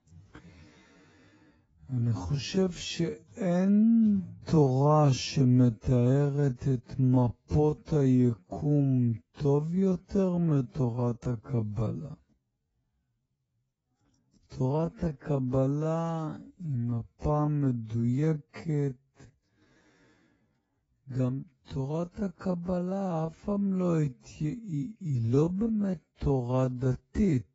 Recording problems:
garbled, watery; badly; nothing above 7.5 kHz
wrong speed, natural pitch; too slow; 0.5 times normal speed

